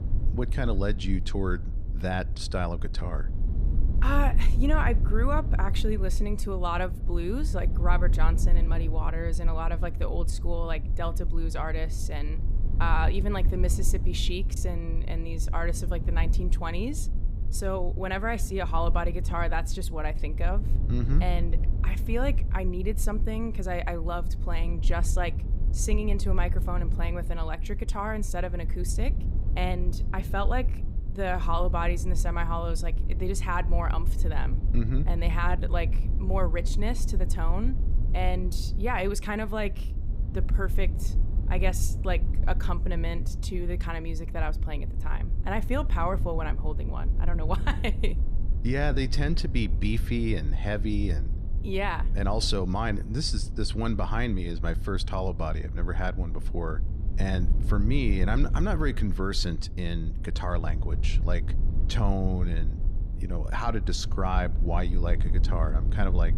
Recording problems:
low rumble; noticeable; throughout; 15 dB below the speech

